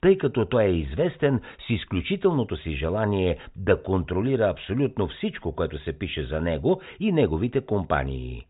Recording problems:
high frequencies cut off; severe; nothing above 4 kHz

